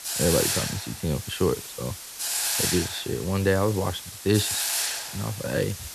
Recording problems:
hiss; loud; throughout; 1 dB below the speech

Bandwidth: 13.5 kHz